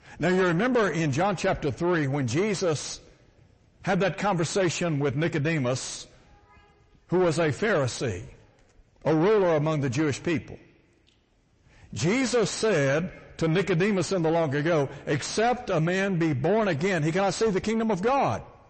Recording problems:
distortion; heavy; 7 dB below the speech
garbled, watery; slightly; nothing above 8 kHz

